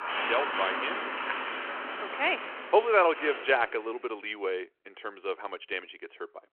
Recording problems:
phone-call audio
traffic noise; loud; until 3 s; 4 dB below the speech

